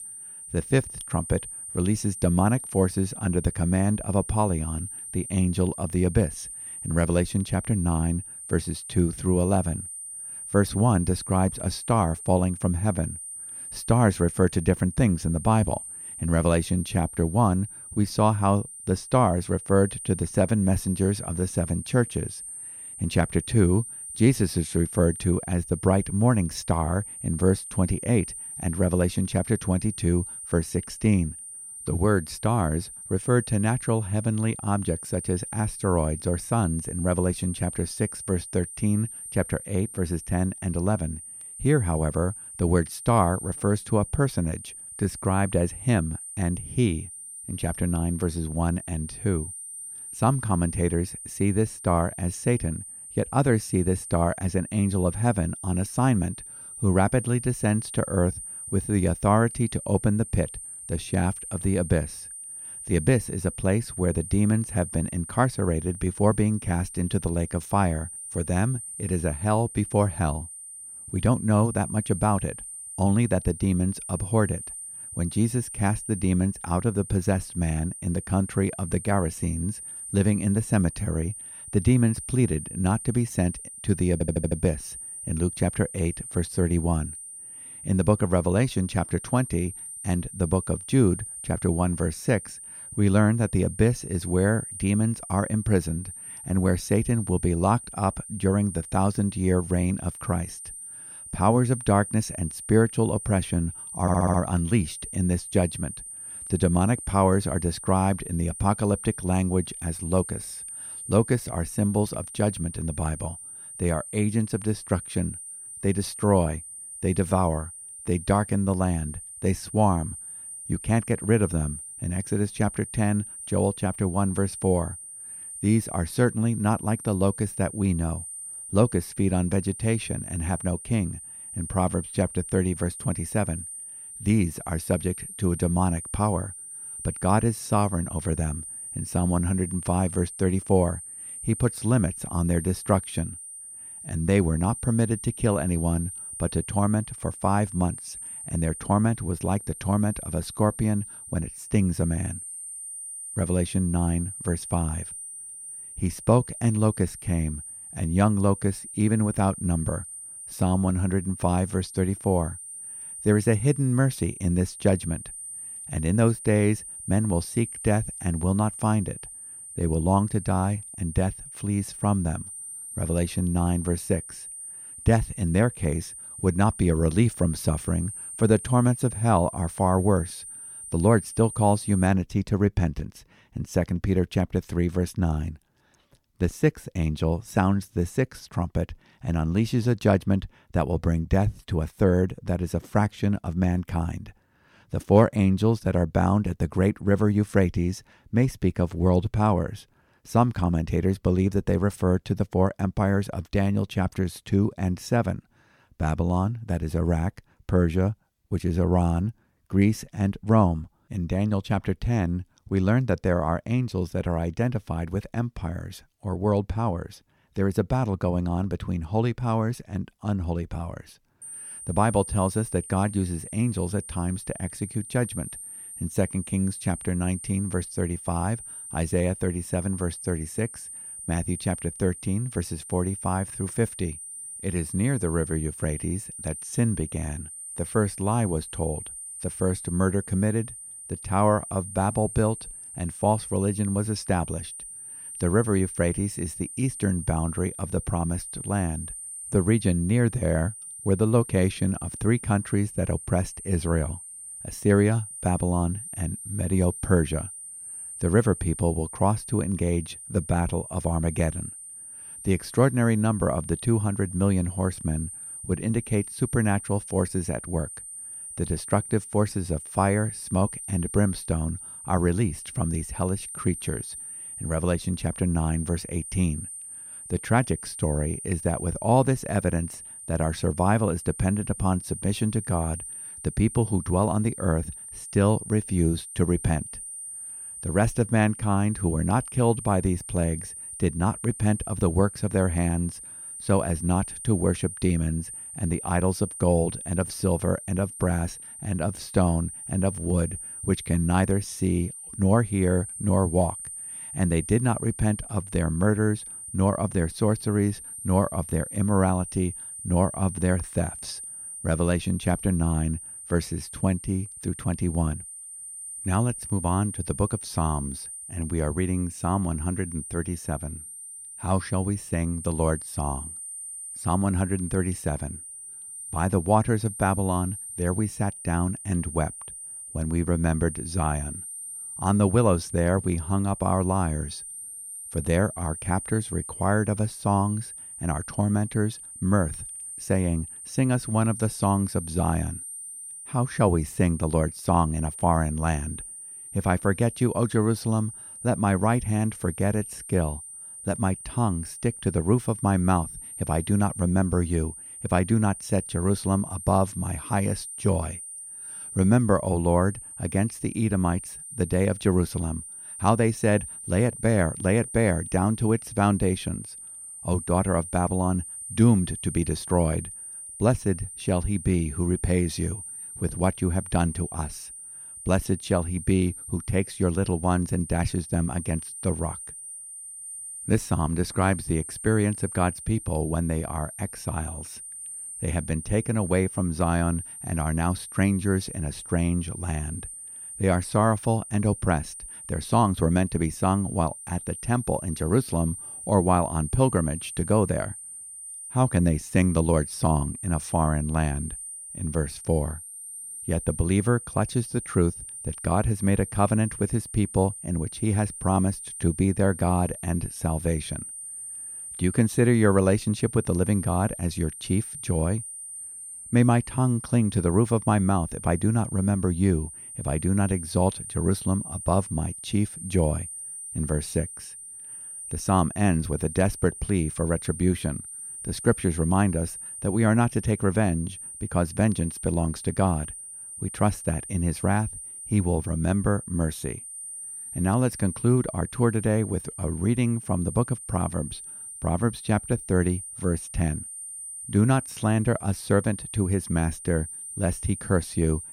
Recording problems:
high-pitched whine; noticeable; until 3:02 and from 3:41 on; 9 kHz, 10 dB below the speech
audio stuttering; at 1:24 and at 1:44

